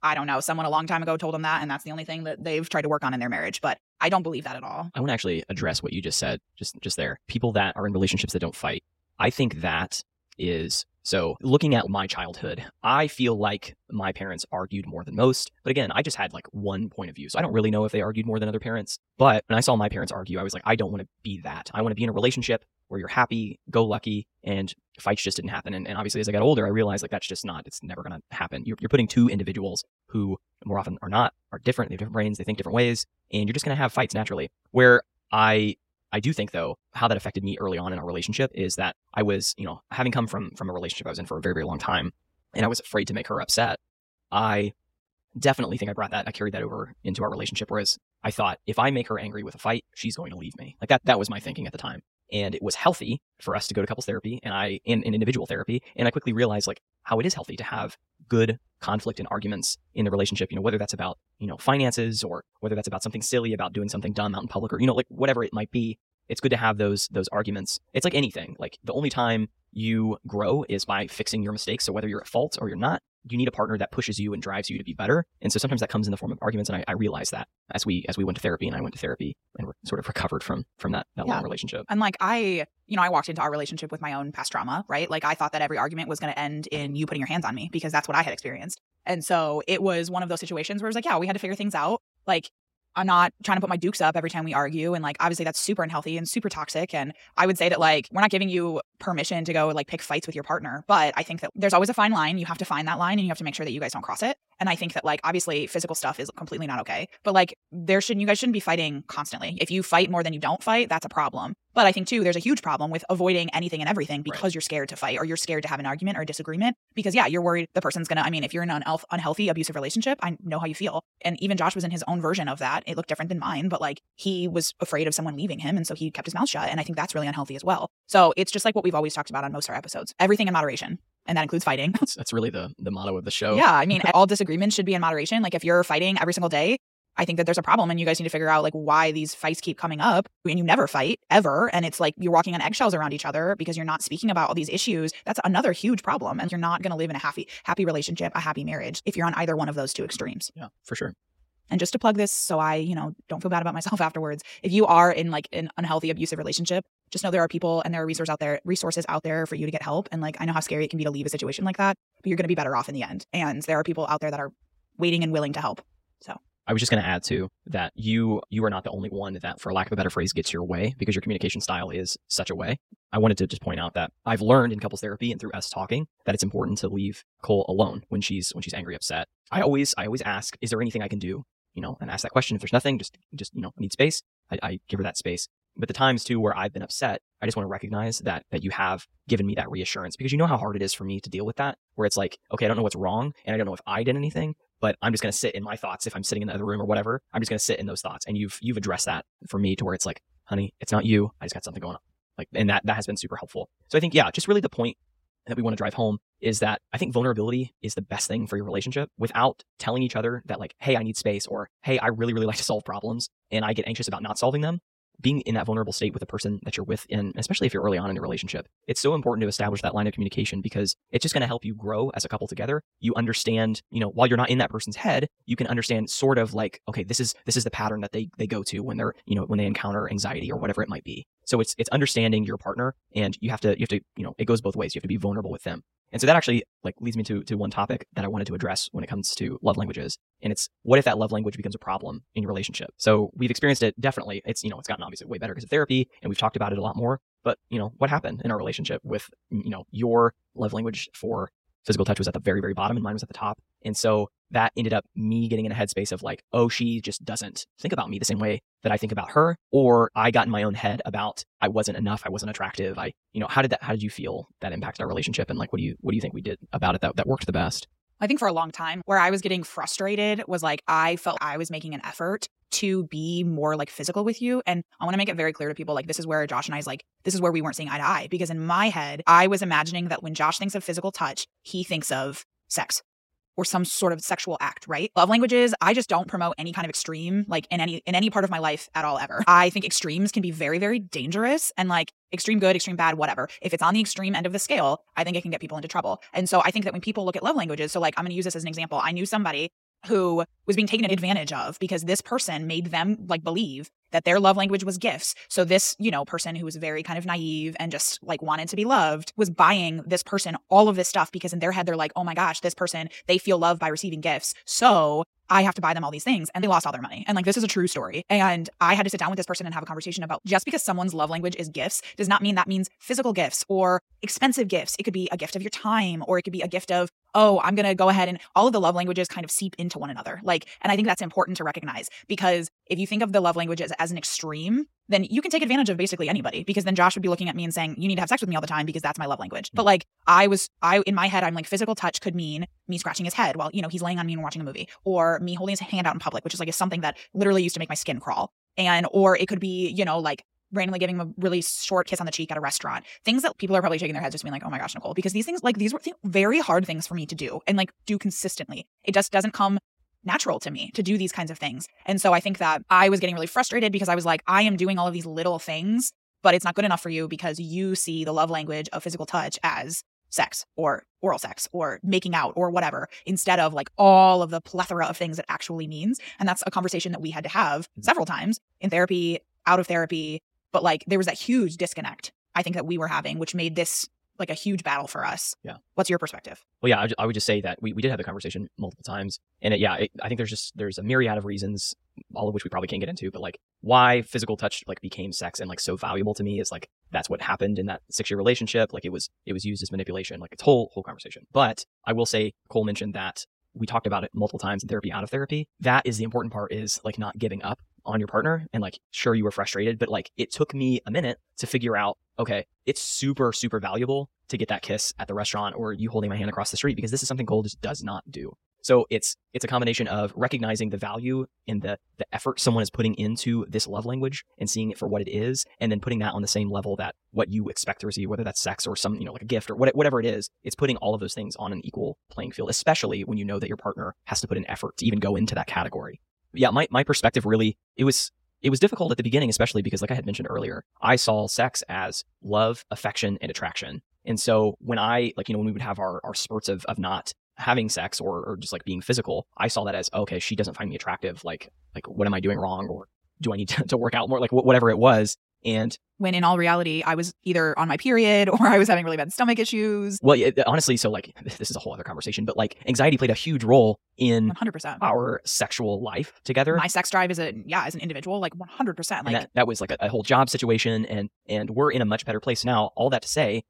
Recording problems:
wrong speed, natural pitch; too fast; 1.6 times normal speed

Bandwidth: 16 kHz